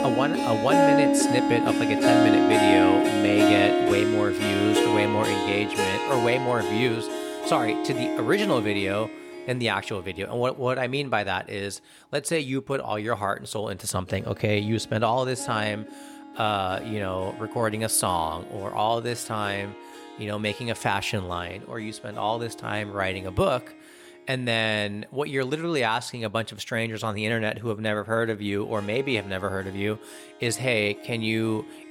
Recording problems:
background music; very loud; throughout; 4 dB above the speech

